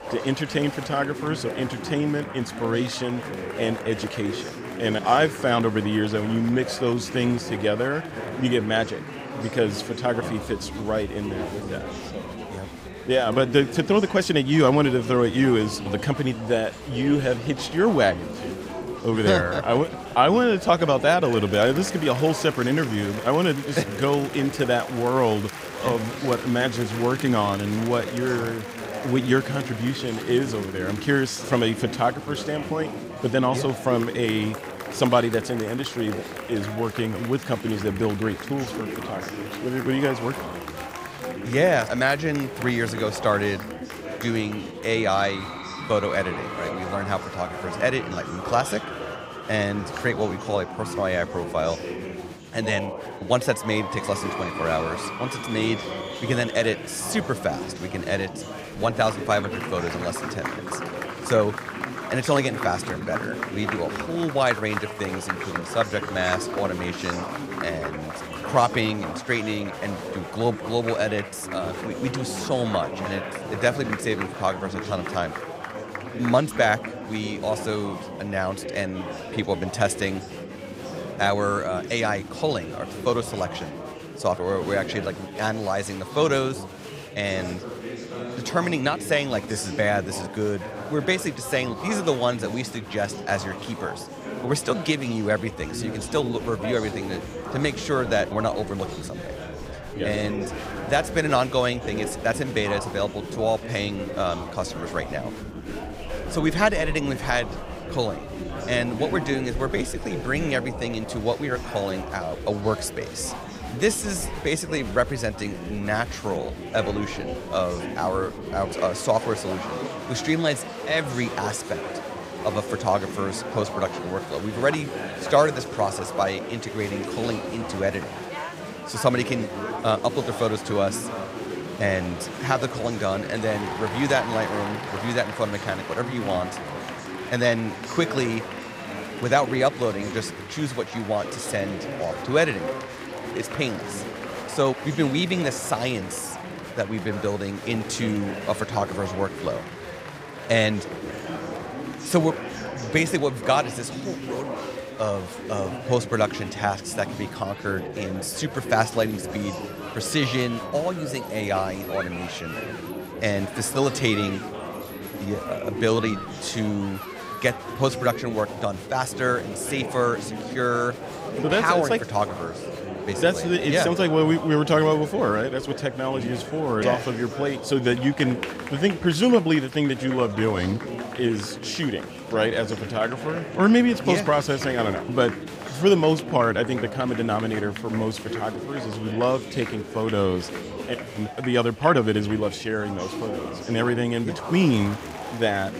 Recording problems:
chatter from many people; loud; throughout; 8 dB below the speech
dog barking; faint; at 2:31; peak 15 dB below the speech

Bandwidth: 15.5 kHz